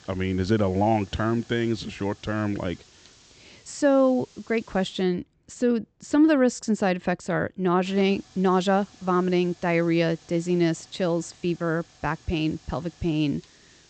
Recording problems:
high frequencies cut off; noticeable; nothing above 8 kHz
hiss; faint; until 5 s and from 8 s on; 25 dB below the speech

